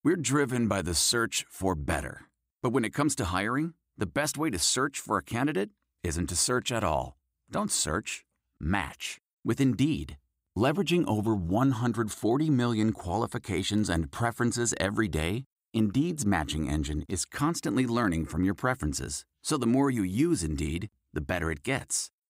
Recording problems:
none

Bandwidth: 15.5 kHz